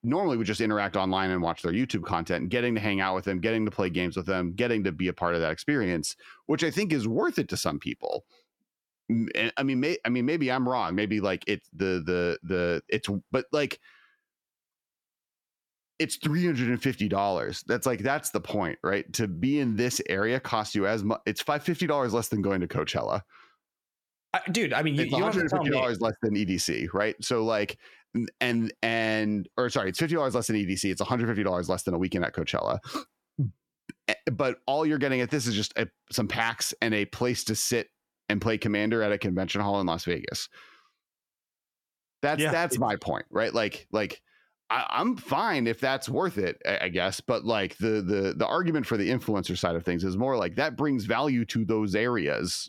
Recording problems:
squashed, flat; somewhat

